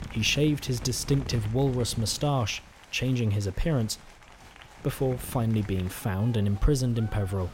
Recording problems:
wind noise on the microphone; occasional gusts; 20 dB below the speech
crowd noise; faint; throughout; 20 dB below the speech

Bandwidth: 16 kHz